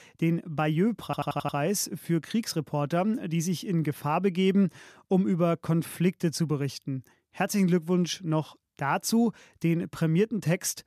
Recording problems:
audio stuttering; at 1 s

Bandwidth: 14.5 kHz